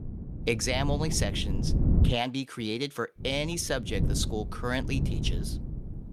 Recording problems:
wind noise on the microphone; occasional gusts; until 2 s and from 3 s on; 10 dB below the speech

